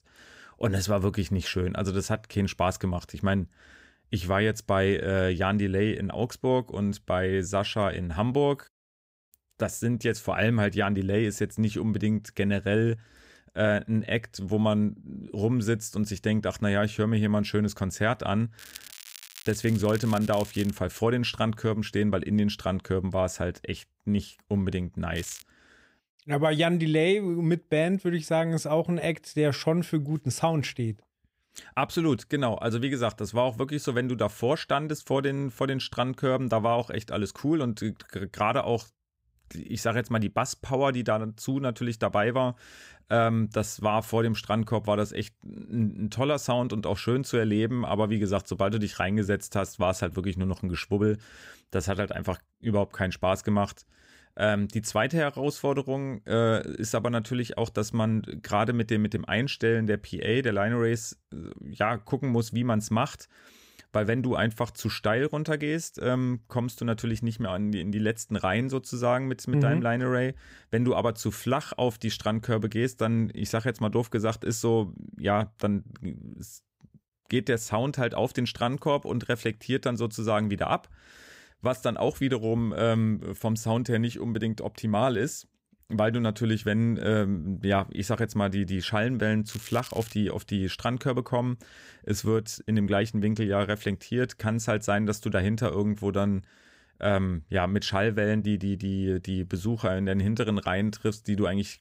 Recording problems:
crackling; noticeable; from 19 to 21 s, at 25 s and at 1:29; 15 dB below the speech

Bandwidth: 15.5 kHz